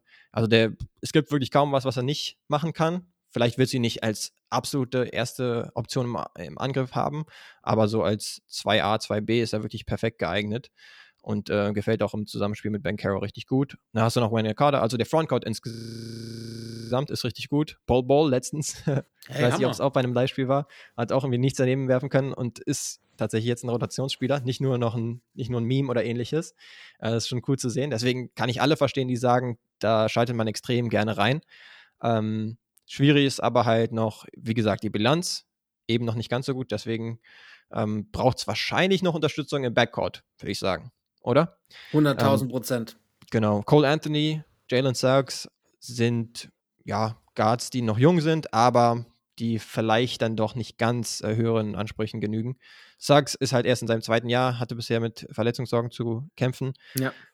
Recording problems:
audio freezing; at 16 s for 1 s

